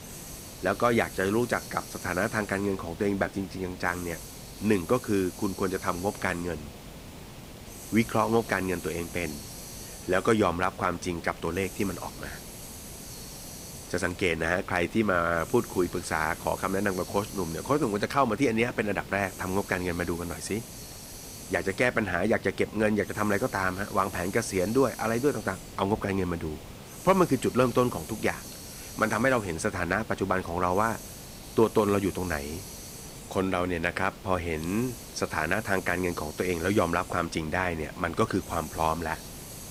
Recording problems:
hiss; noticeable; throughout; 15 dB below the speech

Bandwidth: 15.5 kHz